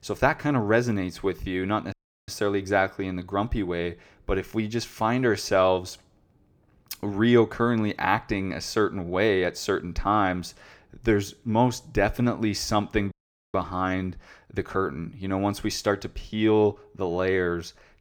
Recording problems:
audio cutting out; at 2 s and at 13 s

